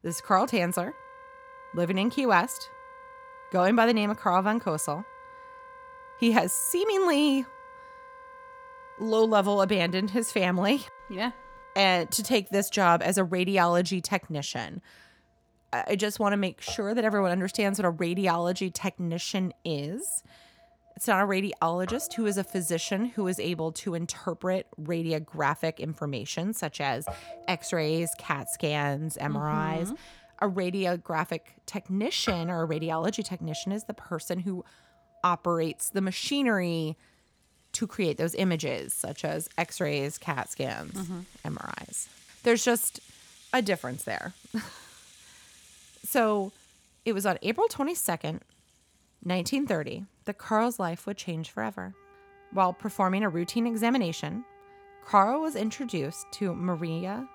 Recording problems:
background music; faint; throughout; 20 dB below the speech

